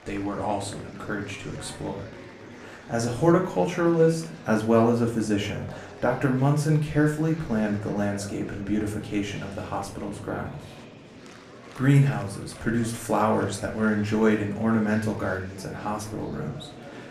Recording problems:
off-mic speech; far
room echo; slight; dies away in 0.4 s
murmuring crowd; noticeable; throughout; 15 dB below the speech

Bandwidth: 15 kHz